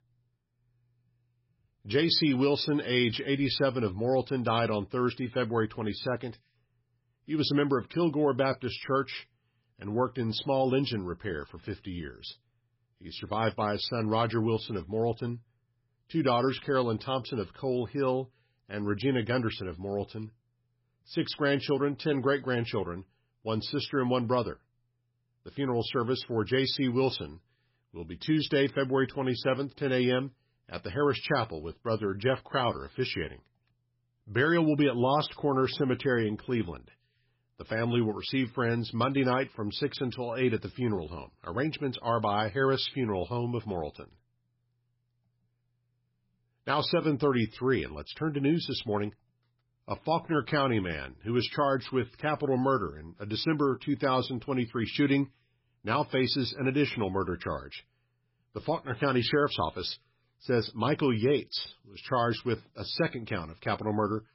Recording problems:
garbled, watery; badly; nothing above 5.5 kHz

